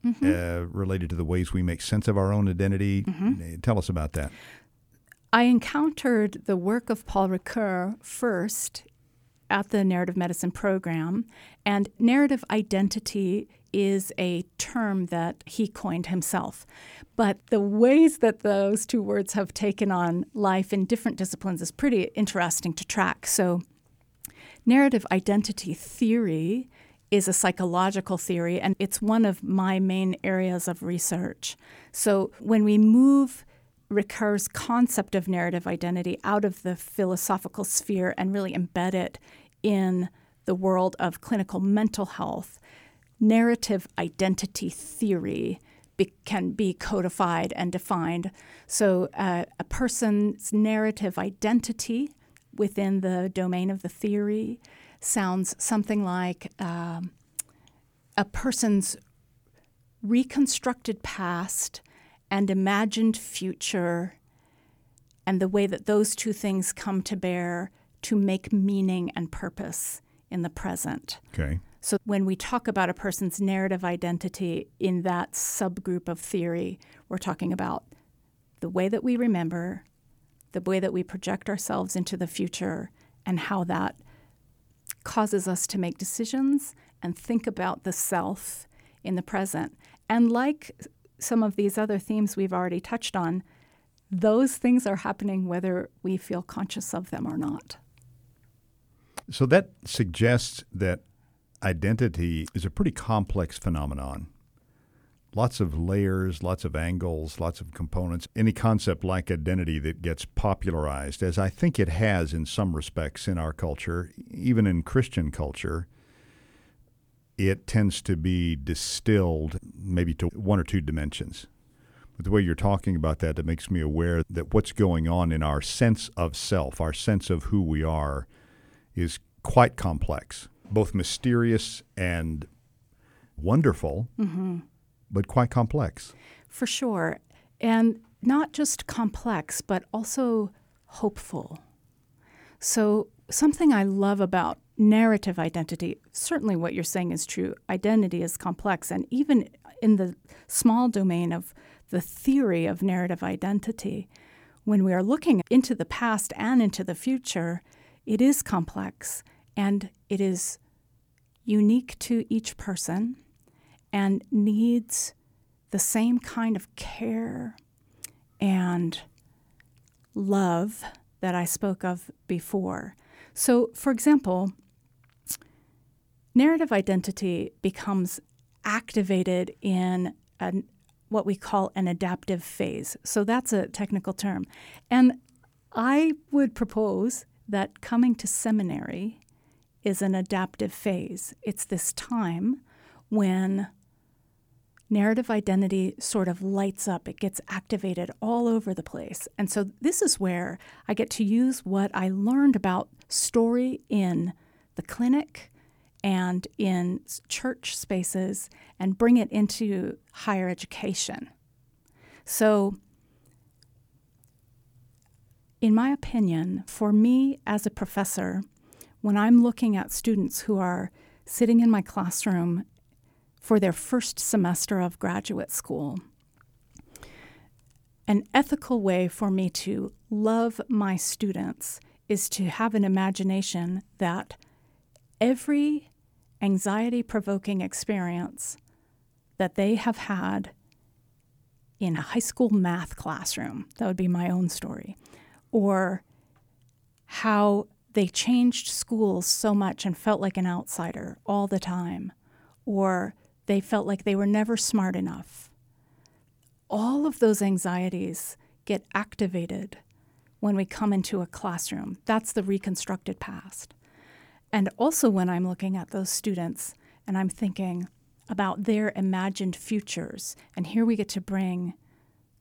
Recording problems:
none

